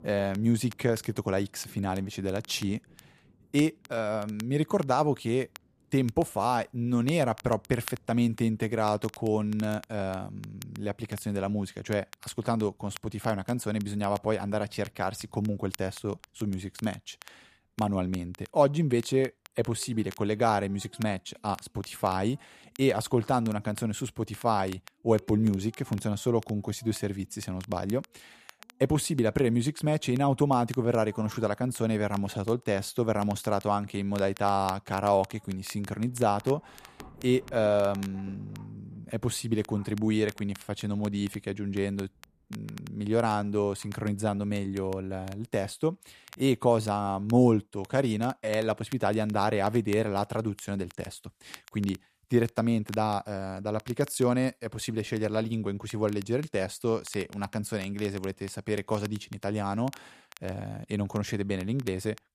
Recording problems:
rain or running water; faint; until 46 s; 30 dB below the speech
crackle, like an old record; faint; 20 dB below the speech

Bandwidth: 14.5 kHz